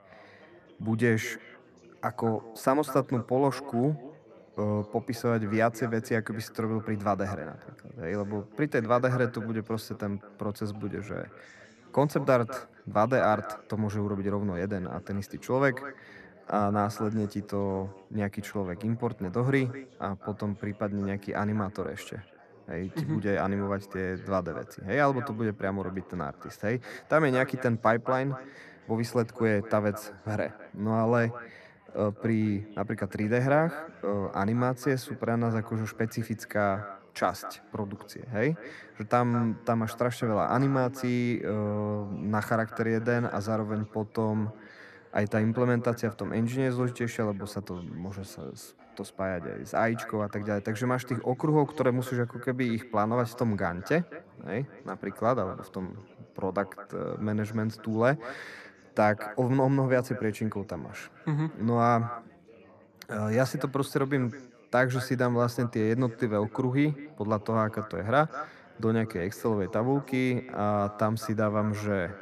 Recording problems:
echo of what is said; noticeable; throughout; 210 ms later, 15 dB below the speech
background chatter; faint; throughout; 4 voices, 25 dB below the speech

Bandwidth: 14 kHz